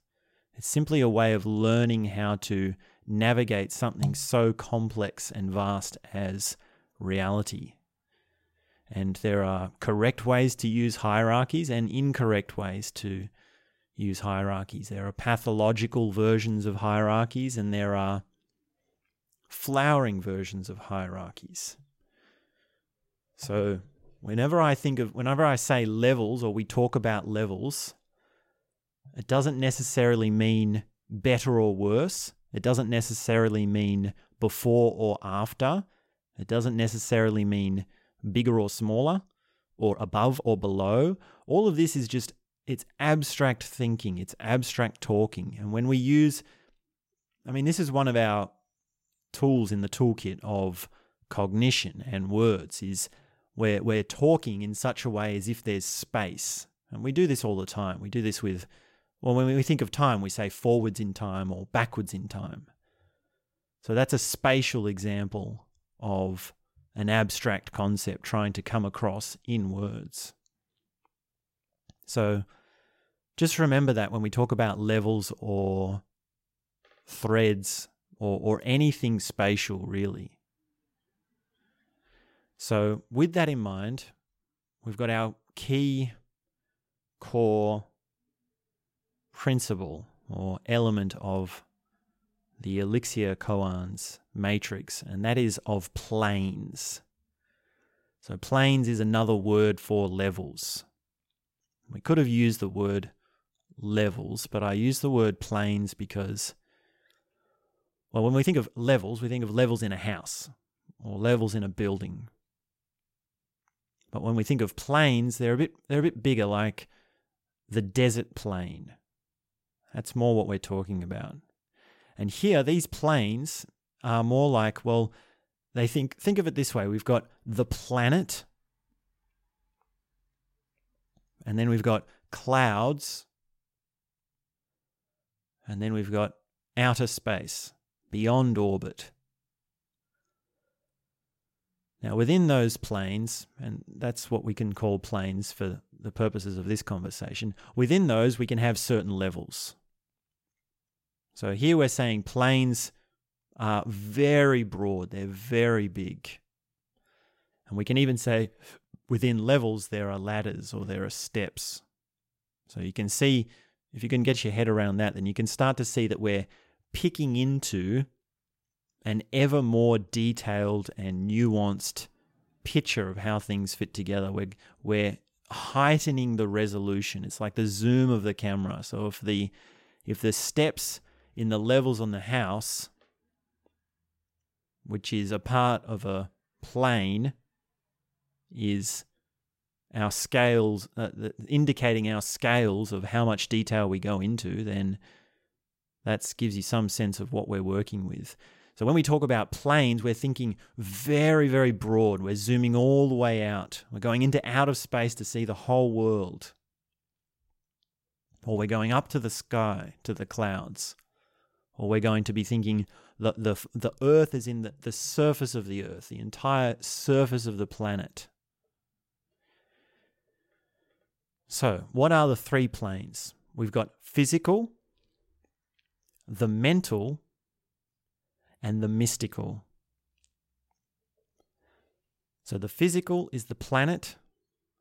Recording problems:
uneven, jittery; strongly; from 32 s to 3:34

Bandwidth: 16 kHz